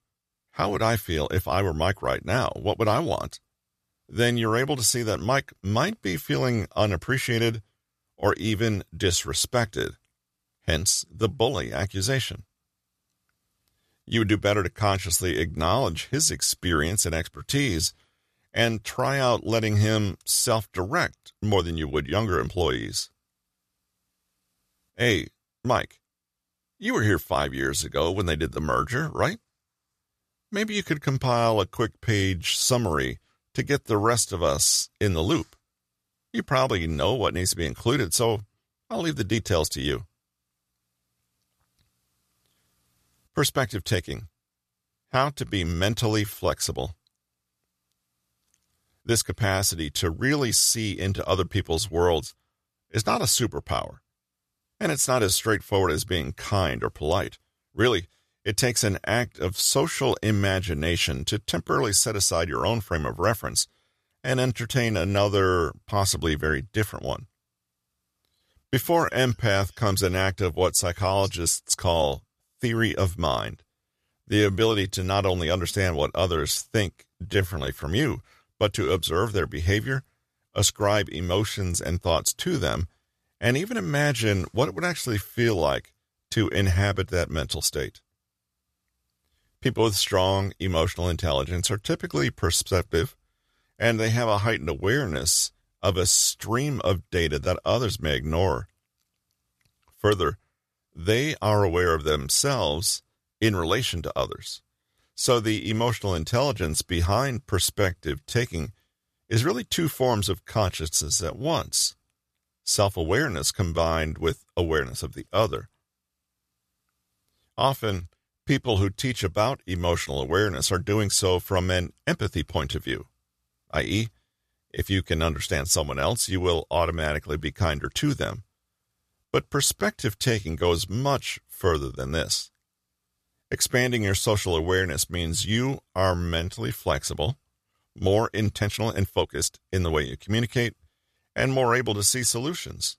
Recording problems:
uneven, jittery; strongly; from 17 s to 2:20

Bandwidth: 14.5 kHz